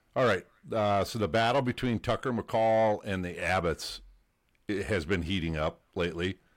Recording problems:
distortion; slight; 10 dB below the speech

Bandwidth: 16 kHz